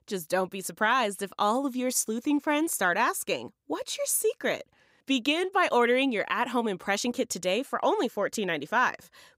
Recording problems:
none

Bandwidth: 15.5 kHz